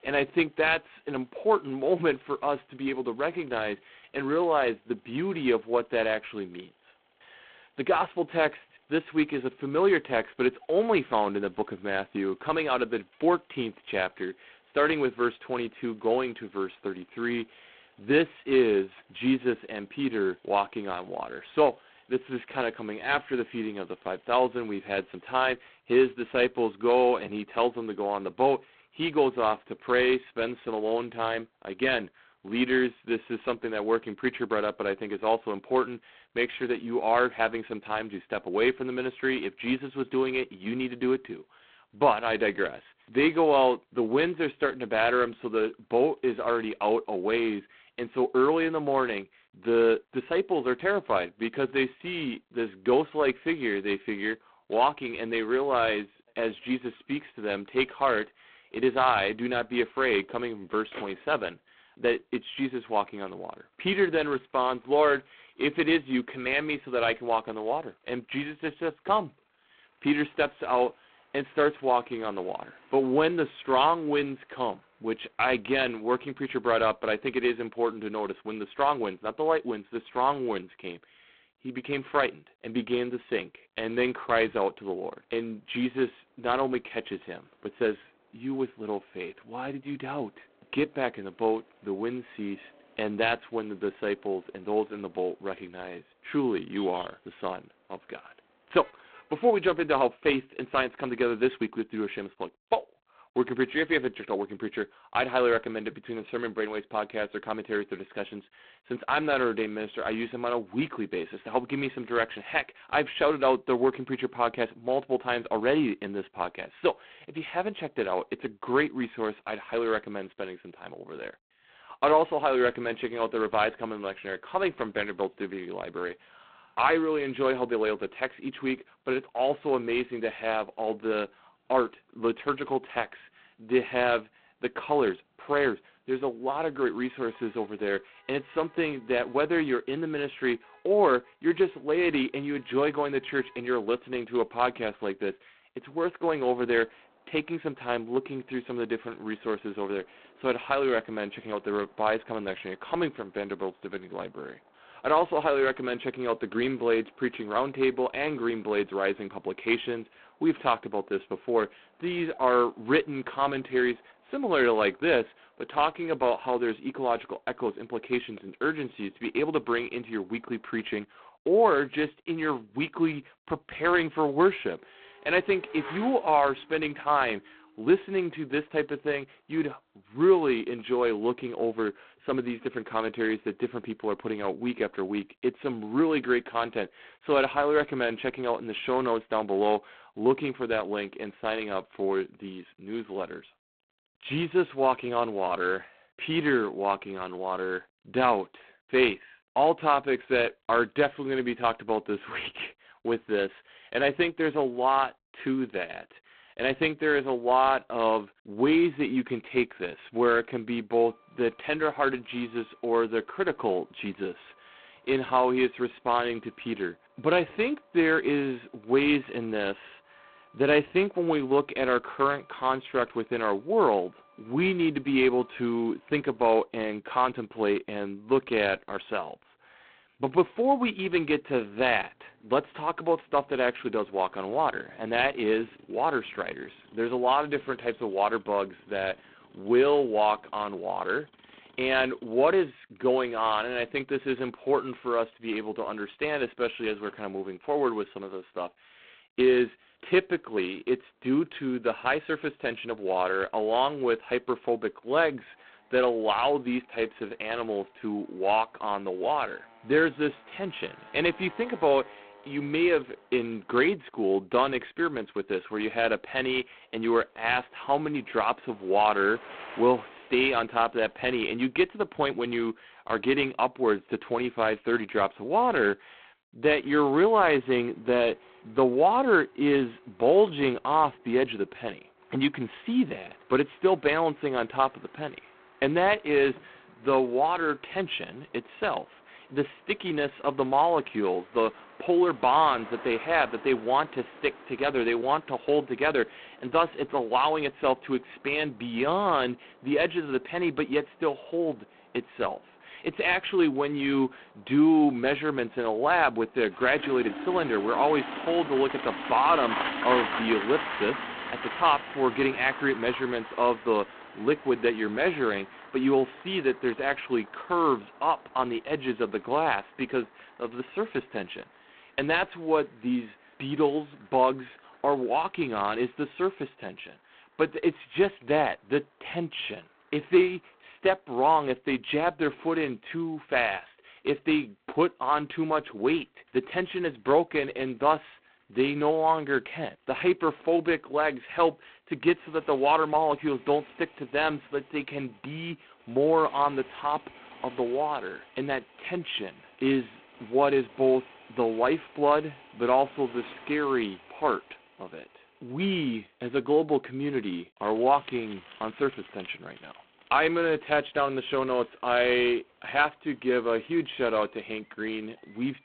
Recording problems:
phone-call audio; poor line; nothing above 4 kHz
traffic noise; noticeable; throughout; 15 dB below the speech

